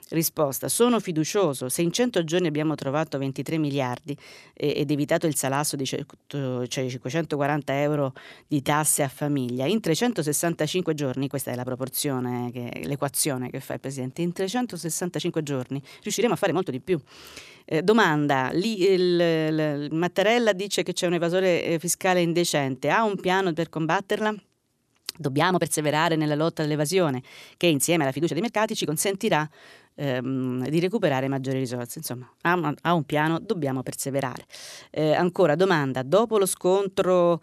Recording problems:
uneven, jittery; strongly; from 2.5 to 29 s

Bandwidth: 14 kHz